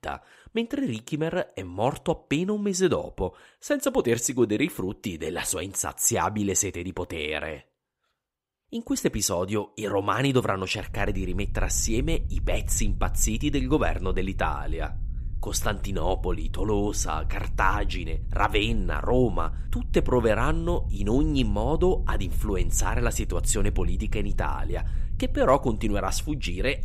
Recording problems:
low rumble; faint; from 11 s on; 25 dB below the speech

